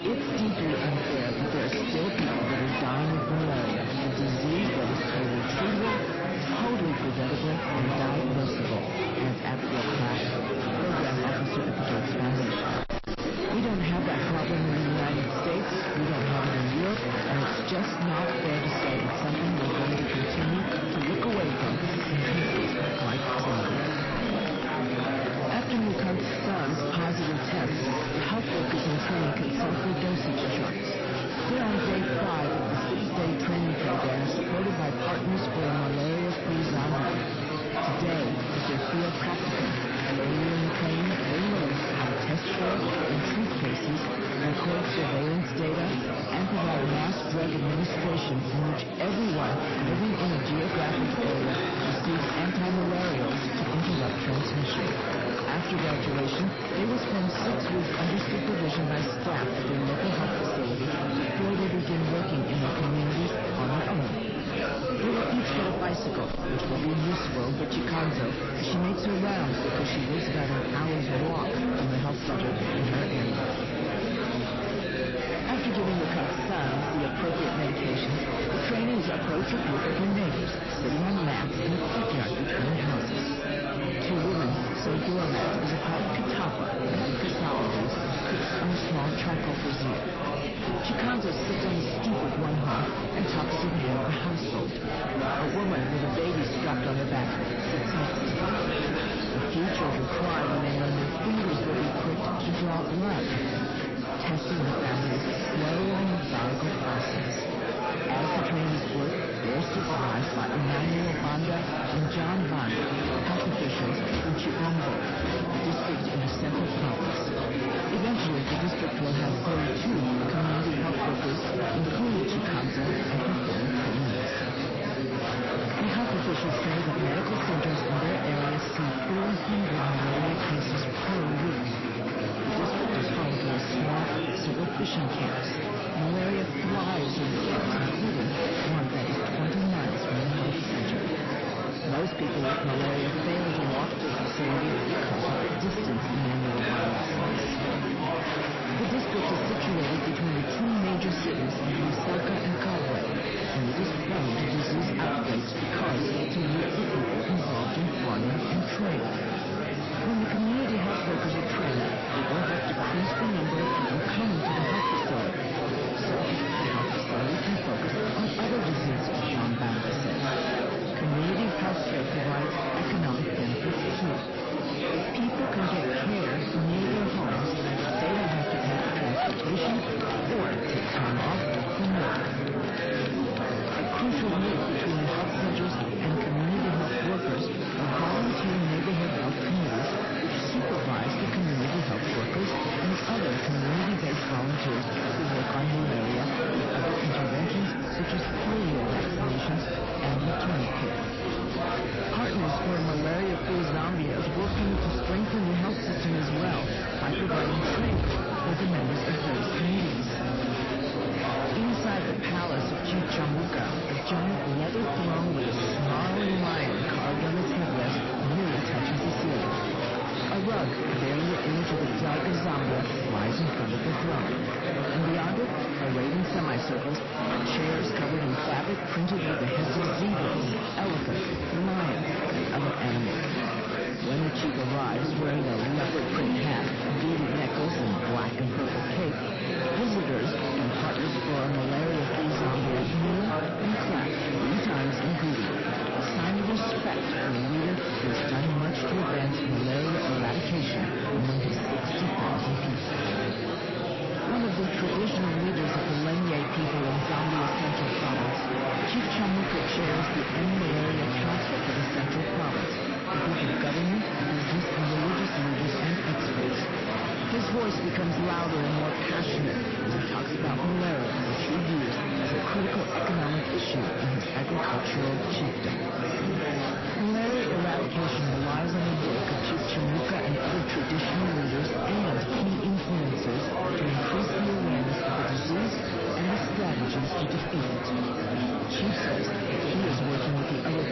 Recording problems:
distortion; slight; 17% of the sound clipped
garbled, watery; slightly; nothing above 5.5 kHz
murmuring crowd; very loud; throughout; 1 dB above the speech

